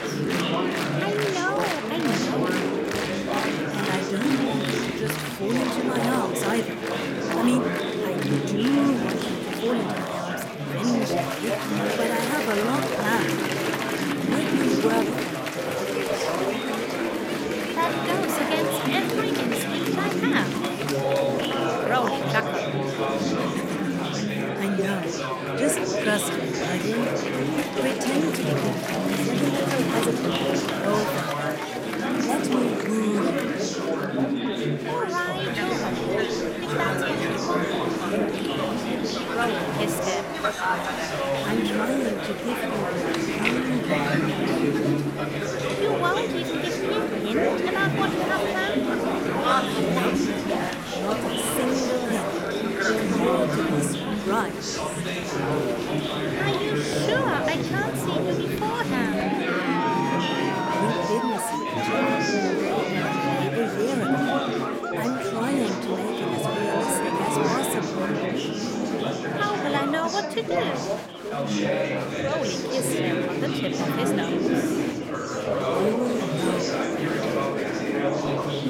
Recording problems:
chatter from many people; very loud; throughout; 4 dB above the speech

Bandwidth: 16.5 kHz